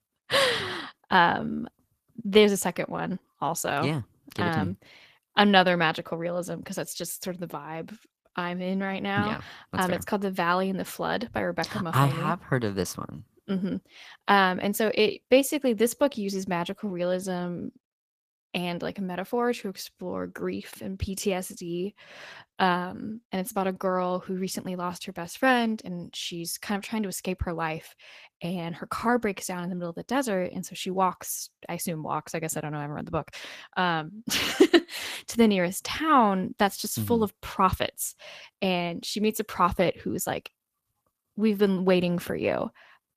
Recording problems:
garbled, watery; slightly; nothing above 14.5 kHz

